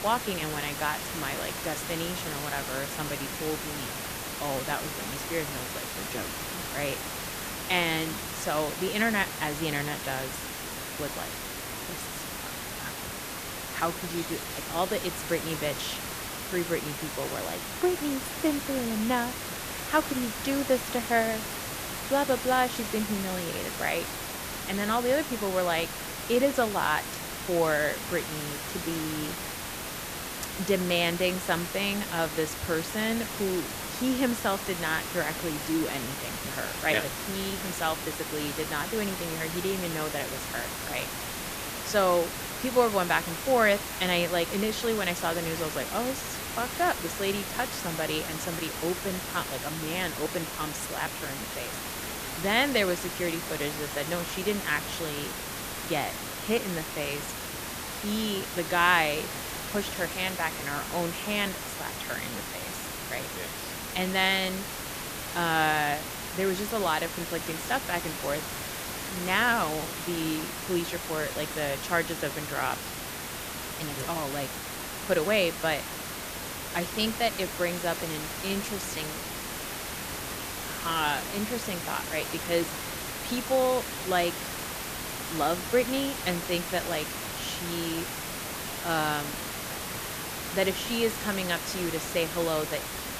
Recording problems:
hiss; loud; throughout; 4 dB below the speech

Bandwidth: 14.5 kHz